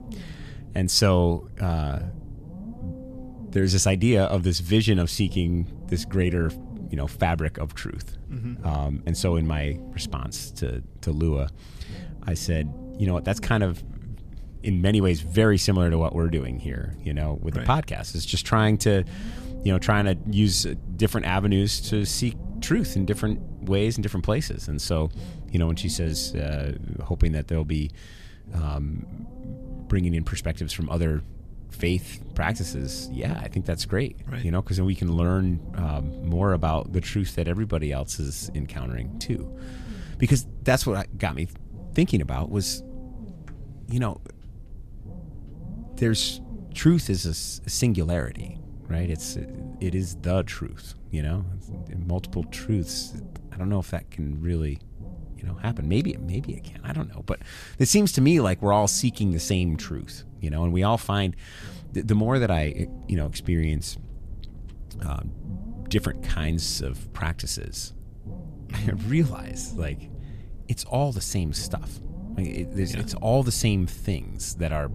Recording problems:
low rumble; noticeable; throughout; 20 dB below the speech

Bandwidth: 14.5 kHz